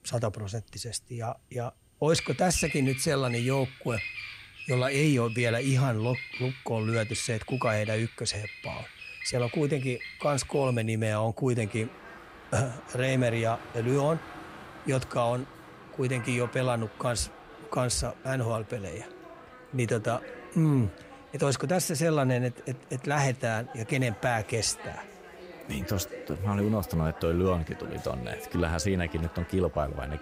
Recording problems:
animal sounds; noticeable; throughout; 15 dB below the speech

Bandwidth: 15.5 kHz